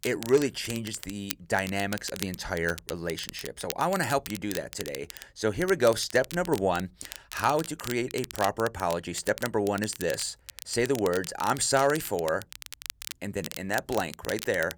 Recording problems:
crackle, like an old record; noticeable; 10 dB below the speech

